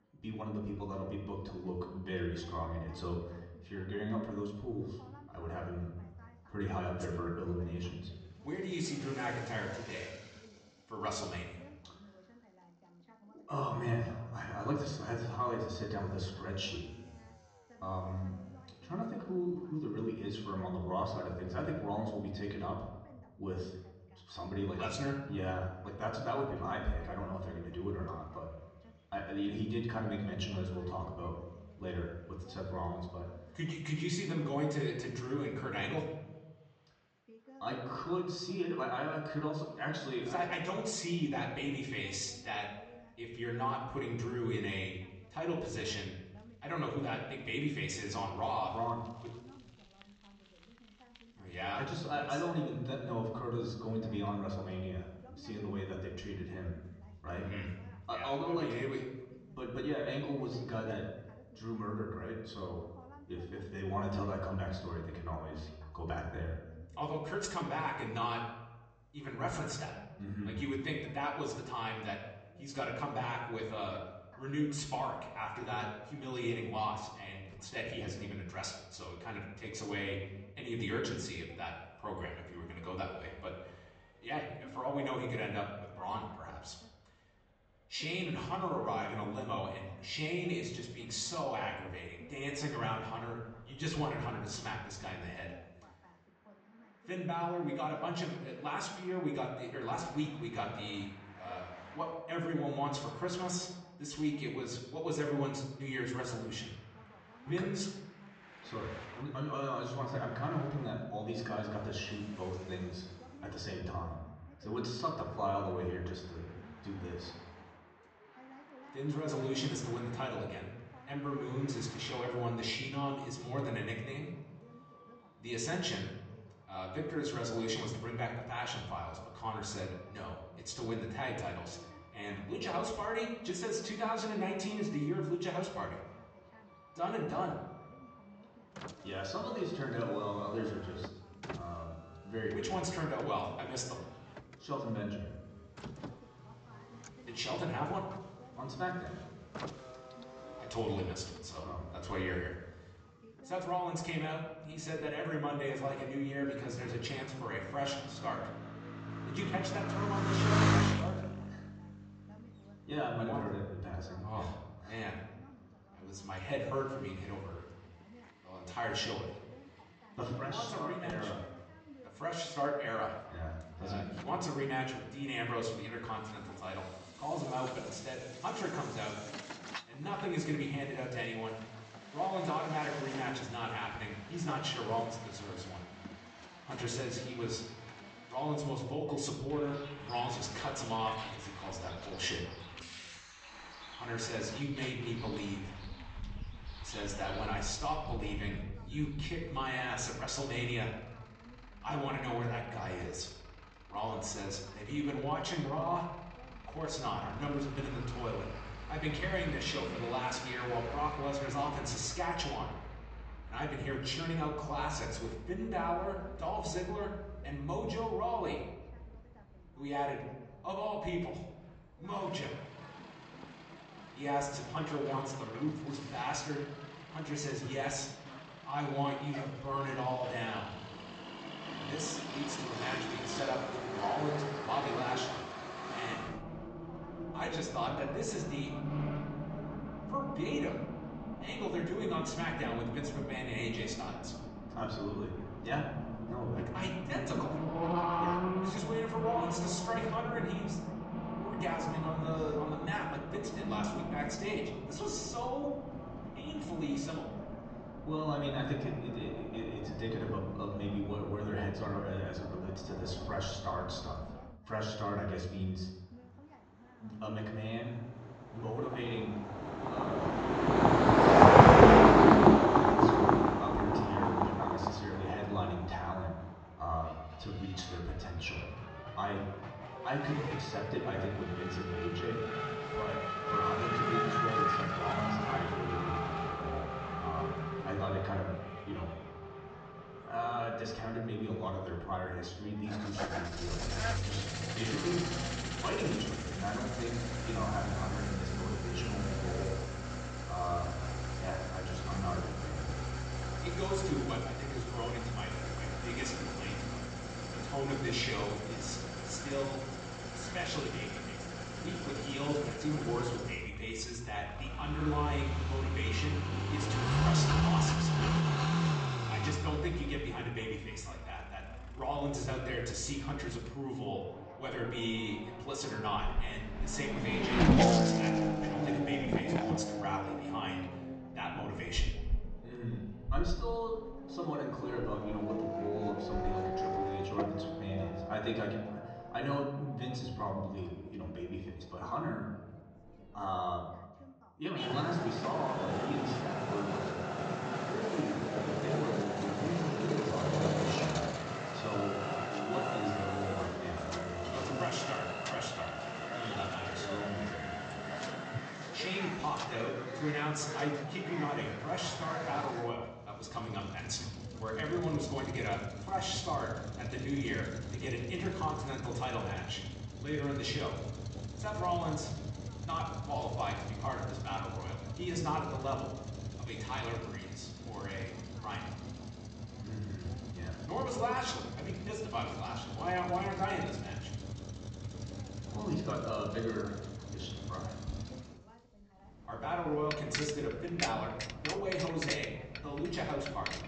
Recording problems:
off-mic speech; far
high frequencies cut off; noticeable; nothing above 8 kHz
room echo; slight; dies away in 0.9 s
traffic noise; very loud; throughout; 3 dB above the speech
voice in the background; faint; throughout; 20 dB below the speech

